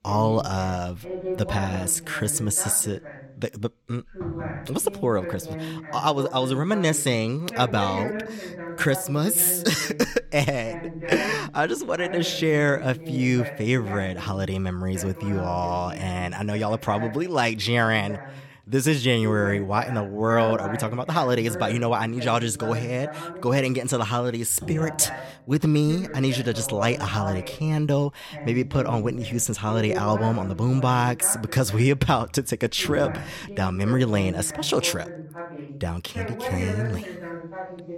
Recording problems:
voice in the background; noticeable; throughout; 10 dB below the speech

